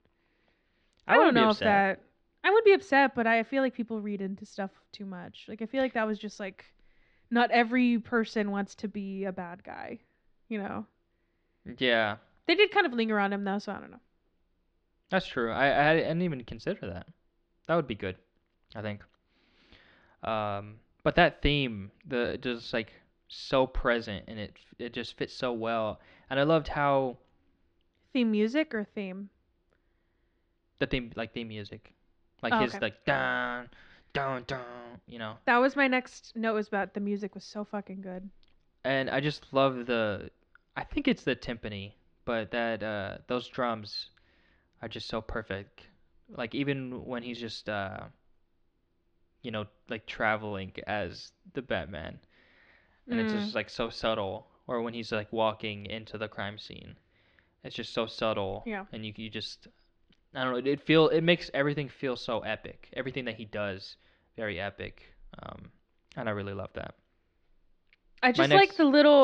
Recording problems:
muffled; slightly; fading above 4 kHz
abrupt cut into speech; at the end

